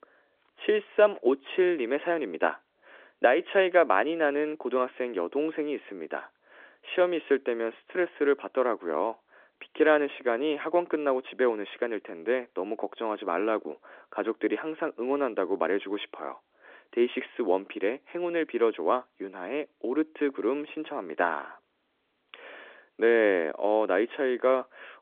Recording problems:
phone-call audio; nothing above 3.5 kHz

